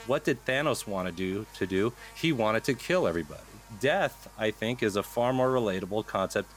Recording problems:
electrical hum; faint; throughout; 50 Hz, 20 dB below the speech

